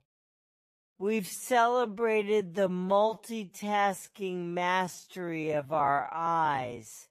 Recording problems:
wrong speed, natural pitch; too slow; 0.5 times normal speed

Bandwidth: 14.5 kHz